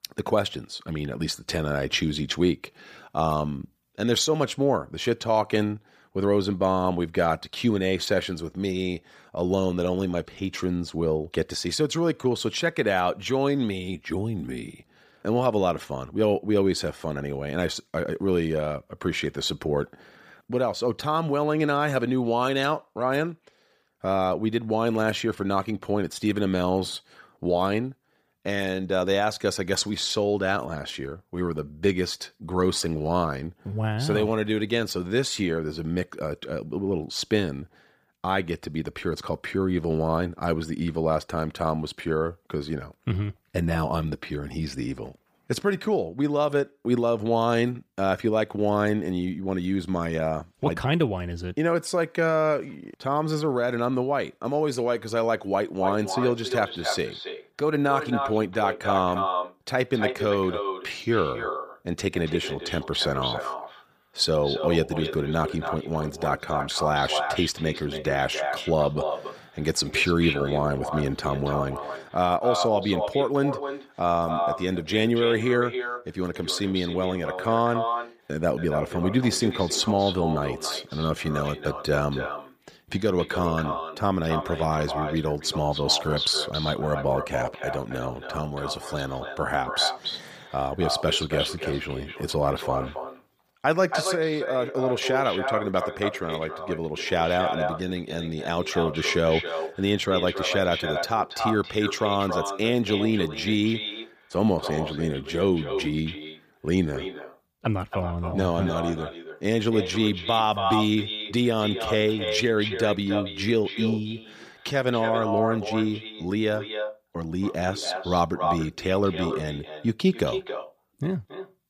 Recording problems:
echo of what is said; strong; from 56 s on; 280 ms later, 6 dB below the speech

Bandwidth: 15 kHz